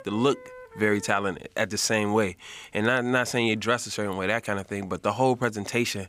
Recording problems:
background music; noticeable; until 1.5 s; 20 dB below the speech

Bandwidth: 15.5 kHz